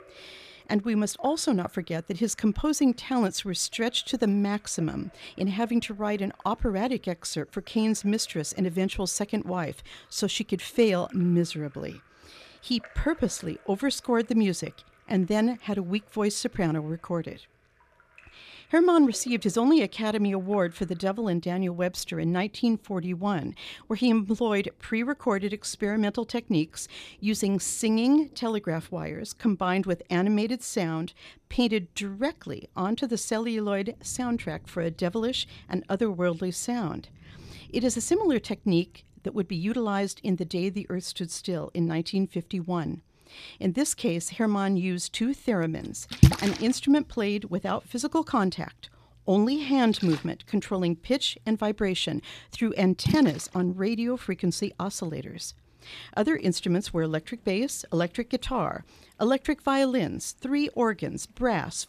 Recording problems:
rain or running water; loud; throughout; 4 dB below the speech

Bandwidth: 14.5 kHz